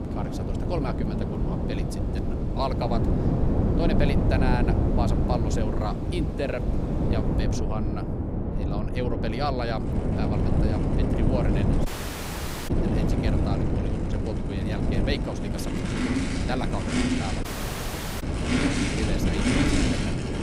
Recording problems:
traffic noise; very loud; throughout; 1 dB above the speech
wind noise on the microphone; heavy; as loud as the speech
audio cutting out; at 12 s for 1 s and at 17 s for 1 s

